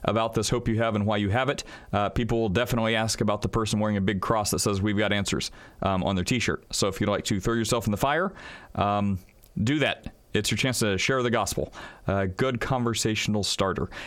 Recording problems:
squashed, flat; heavily

